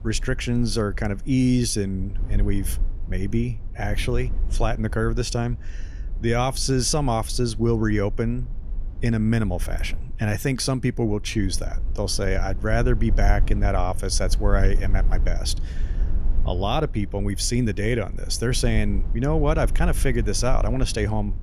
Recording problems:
low rumble; faint; throughout; 20 dB below the speech

